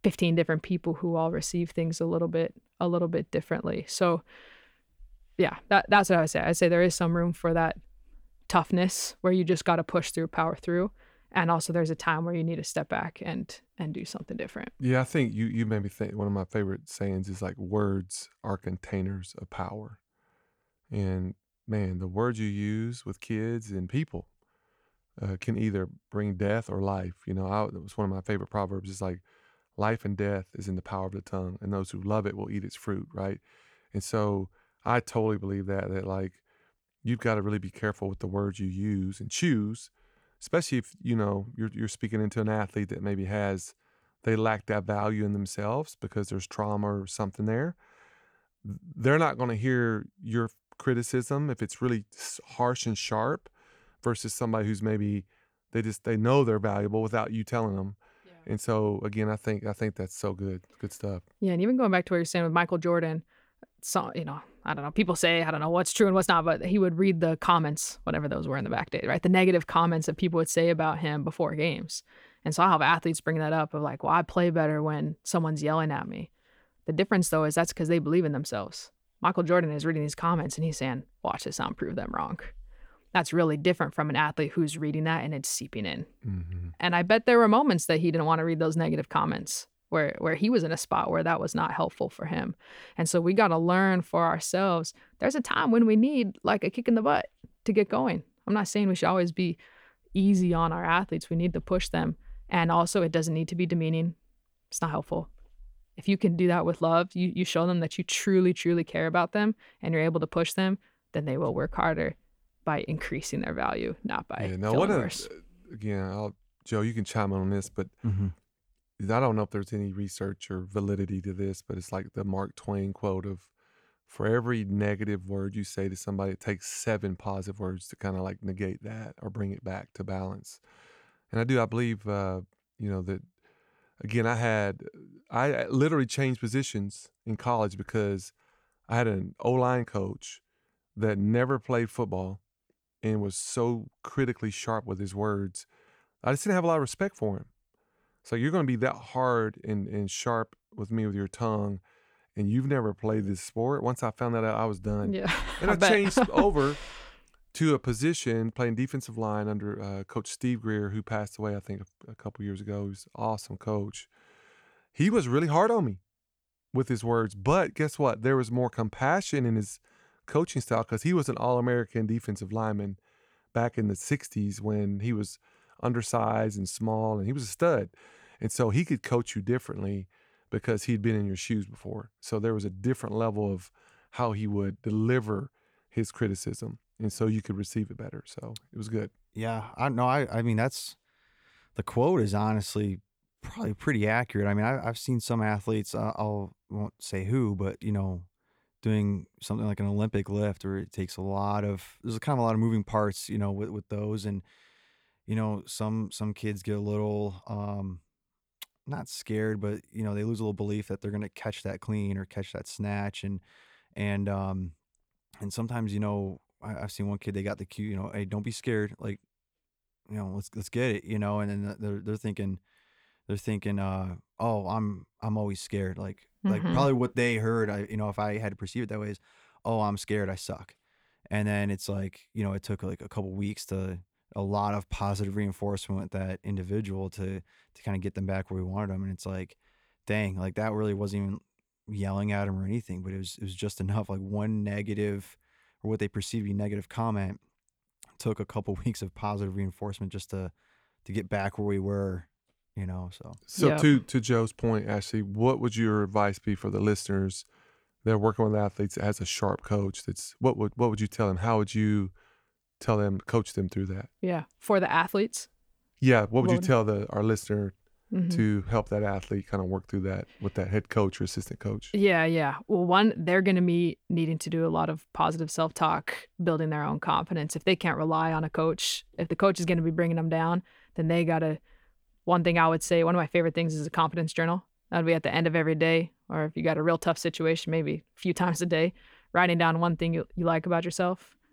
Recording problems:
none

